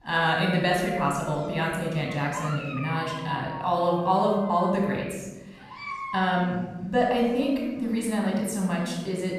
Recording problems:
room echo; noticeable; dies away in 1.1 s
off-mic speech; somewhat distant
animal sounds; noticeable; throughout; 10 dB below the speech

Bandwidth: 14.5 kHz